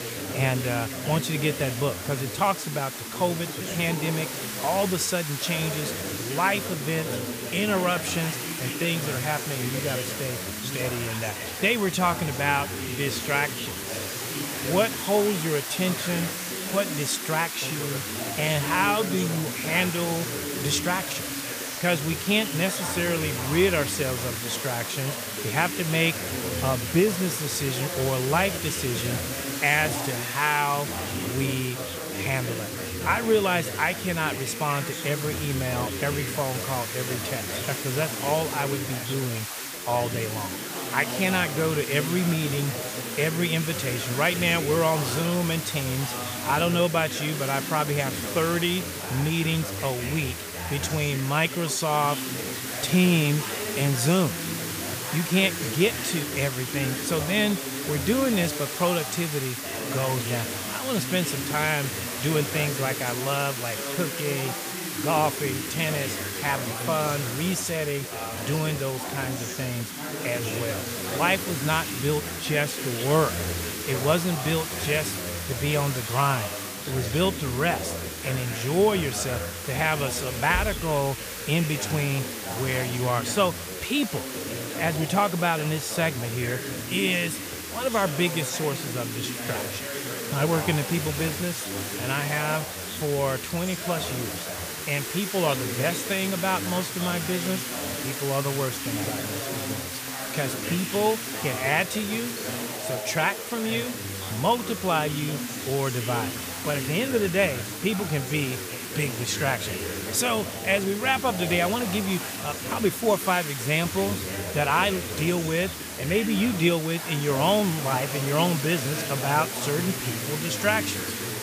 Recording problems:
background chatter; loud; throughout; 4 voices, 8 dB below the speech
hiss; loud; throughout; 6 dB below the speech

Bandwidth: 15 kHz